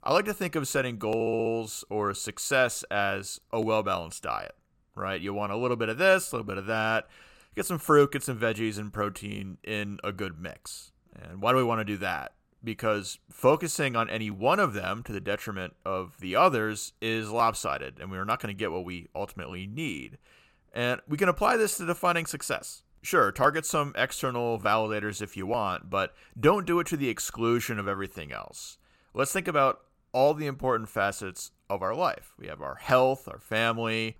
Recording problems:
audio stuttering; at 1 s

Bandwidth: 16.5 kHz